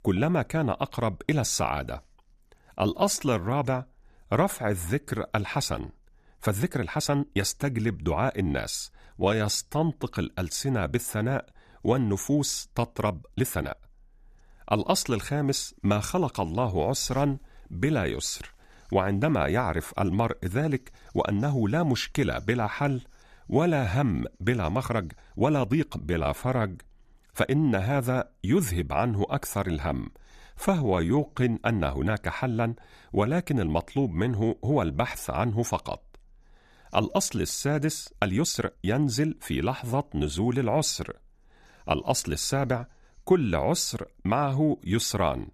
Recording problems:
uneven, jittery; strongly; from 2.5 to 39 s

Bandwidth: 14.5 kHz